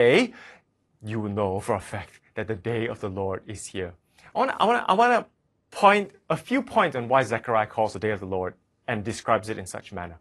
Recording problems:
garbled, watery; slightly; nothing above 11 kHz
abrupt cut into speech; at the start

